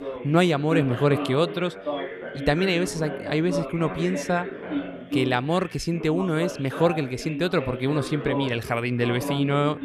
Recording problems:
background chatter; loud; throughout; 3 voices, 8 dB below the speech

